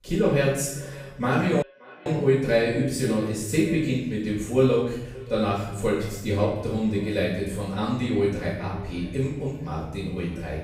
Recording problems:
off-mic speech; far
room echo; noticeable; dies away in 1 s
echo of what is said; faint; throughout; 570 ms later, 20 dB below the speech
audio cutting out; at 1.5 s

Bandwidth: 15.5 kHz